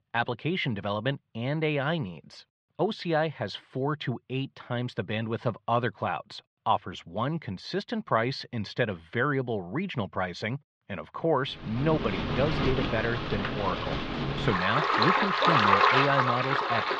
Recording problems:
muffled; slightly; fading above 3.5 kHz
rain or running water; very loud; from 12 s on; 4 dB above the speech

